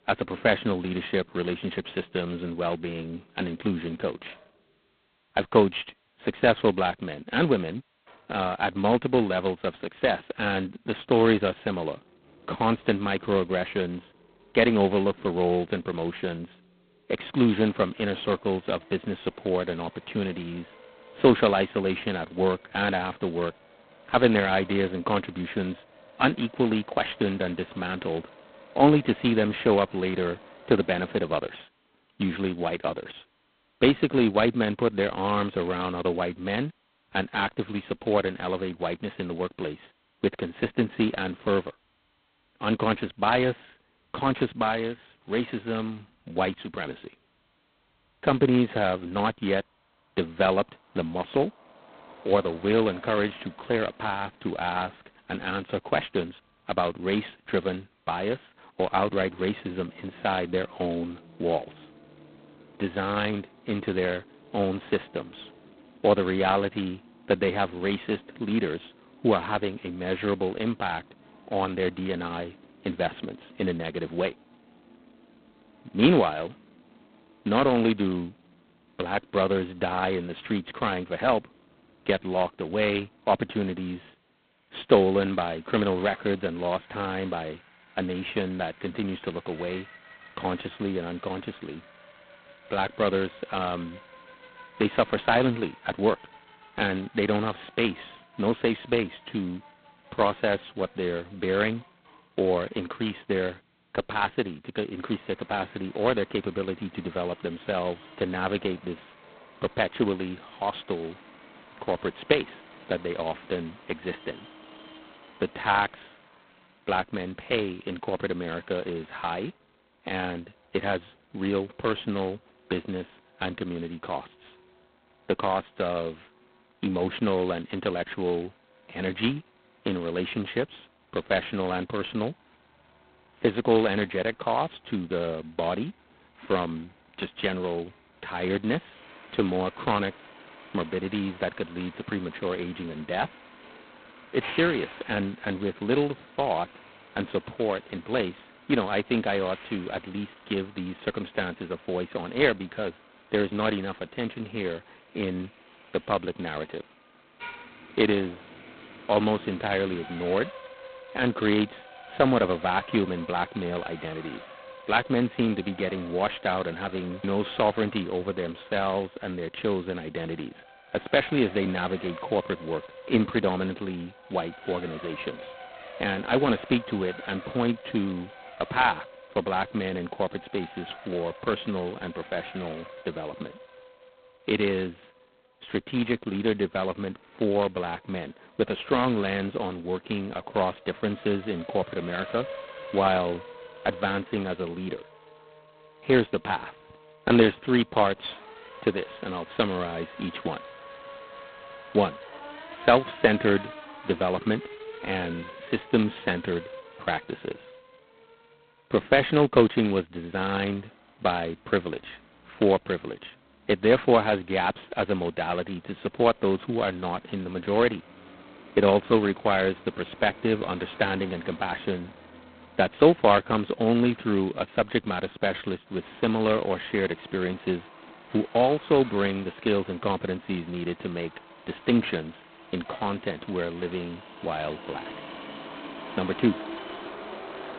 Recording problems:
phone-call audio; poor line; nothing above 4 kHz
traffic noise; noticeable; throughout; 20 dB below the speech

